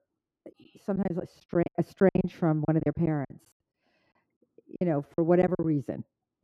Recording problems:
muffled; very; fading above 2 kHz
choppy; very; 15% of the speech affected

